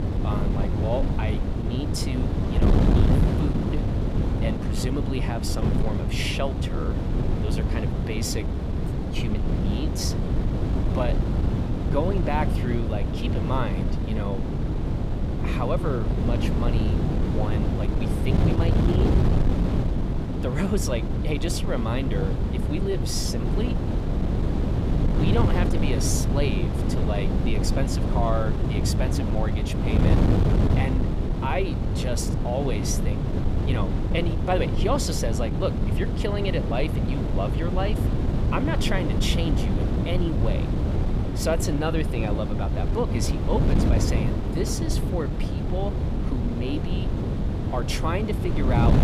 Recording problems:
wind noise on the microphone; heavy; 2 dB below the speech

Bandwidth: 15 kHz